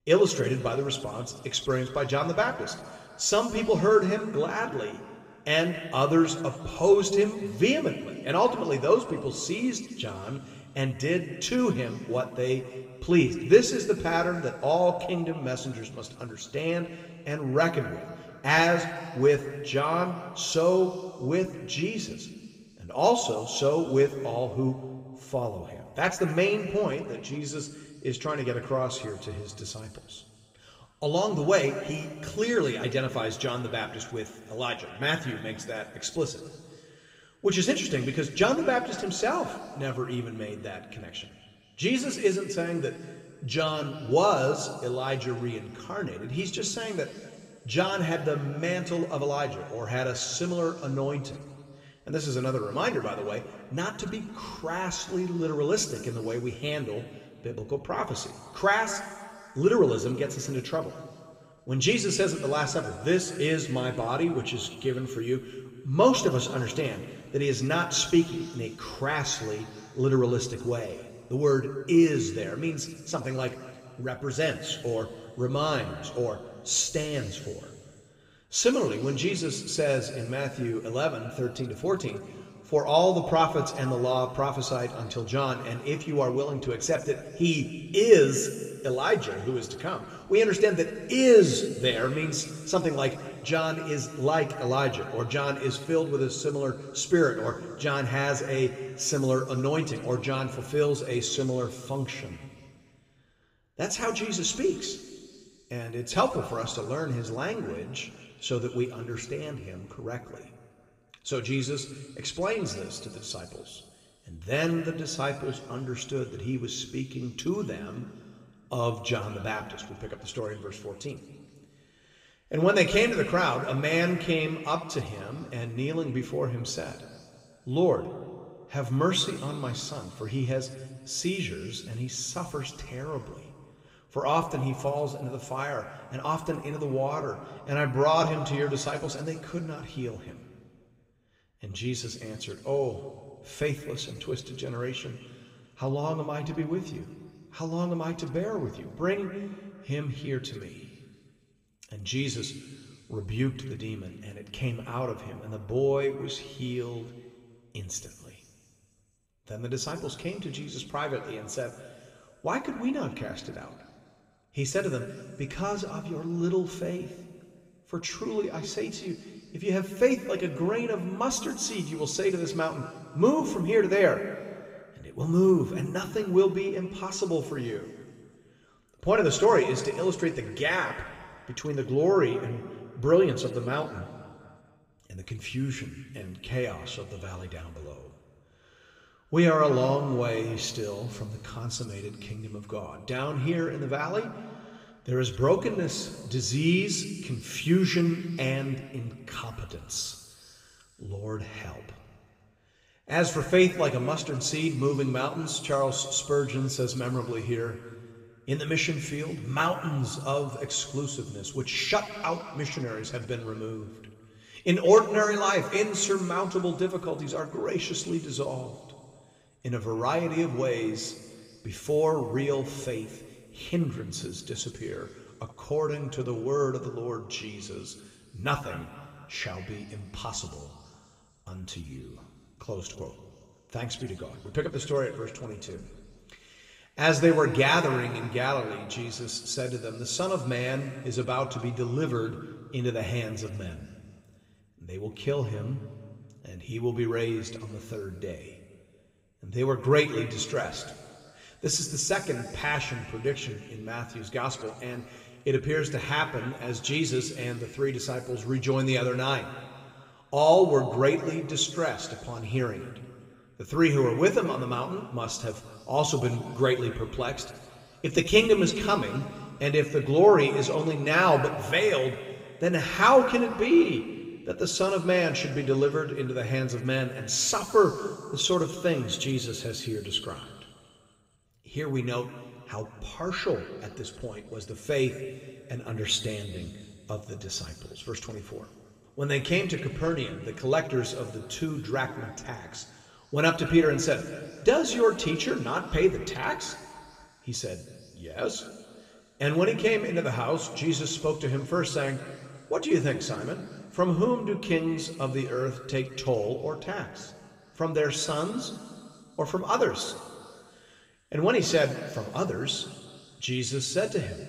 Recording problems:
room echo; slight; dies away in 2.1 s
off-mic speech; somewhat distant

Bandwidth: 15.5 kHz